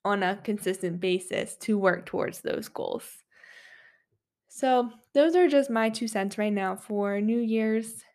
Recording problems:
none

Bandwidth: 14.5 kHz